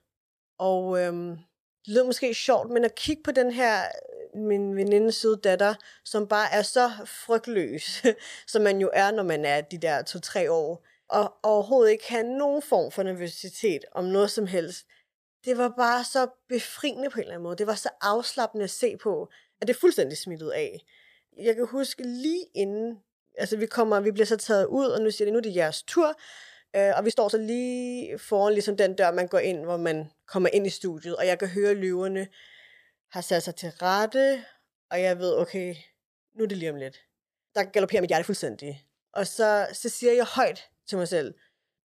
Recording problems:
uneven, jittery; strongly; from 4 to 40 s

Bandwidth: 15 kHz